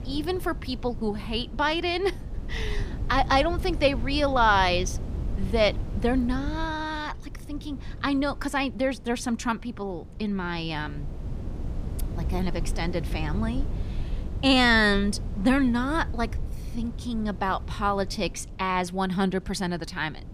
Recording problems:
wind noise on the microphone; occasional gusts; 20 dB below the speech

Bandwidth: 15 kHz